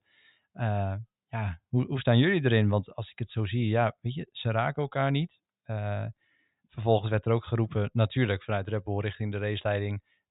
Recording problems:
high frequencies cut off; severe; nothing above 4 kHz

